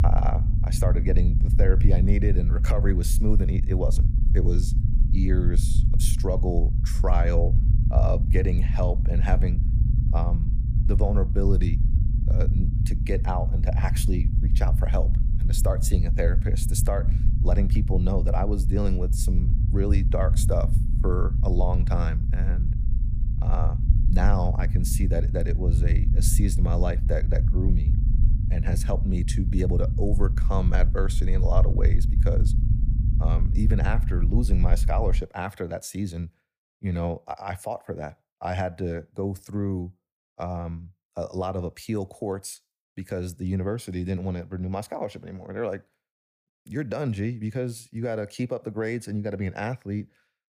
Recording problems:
low rumble; loud; until 35 s; 8 dB below the speech

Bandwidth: 15 kHz